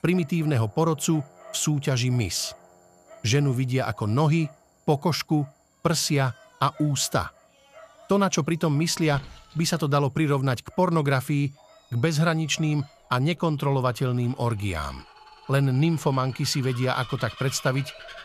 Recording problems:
animal sounds; faint; throughout; 20 dB below the speech

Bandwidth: 14.5 kHz